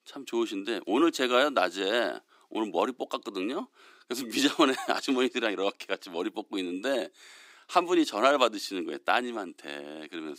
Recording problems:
thin; very slightly; fading below 250 Hz

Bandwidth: 15.5 kHz